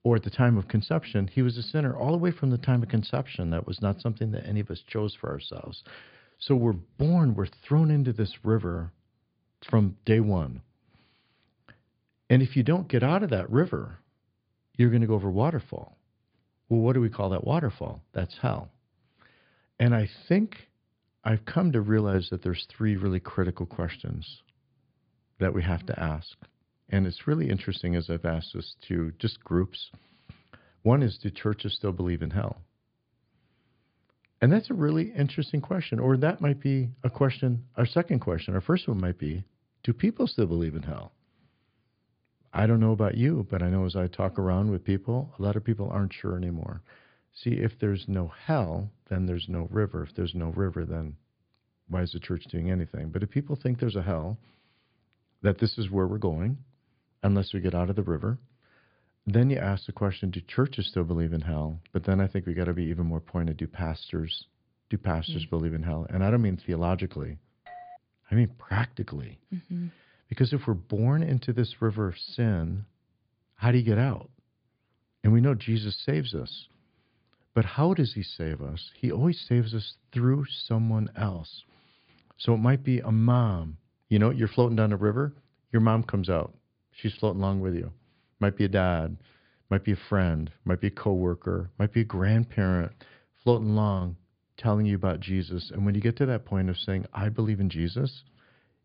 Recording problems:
high frequencies cut off; severe; nothing above 5 kHz
doorbell; faint; at 1:08; peak 20 dB below the speech

